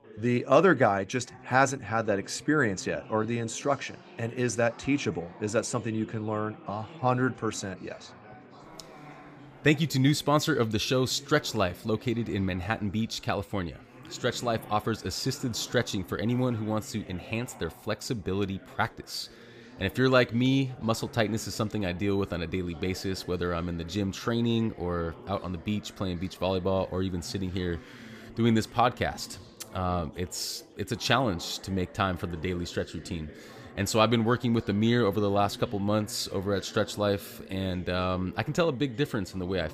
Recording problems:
chatter from many people; noticeable; throughout; 20 dB below the speech

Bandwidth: 15 kHz